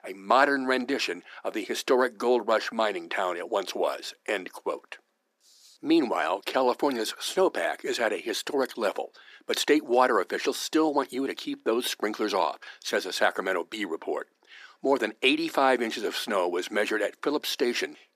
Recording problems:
thin; somewhat; fading below 300 Hz

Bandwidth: 14.5 kHz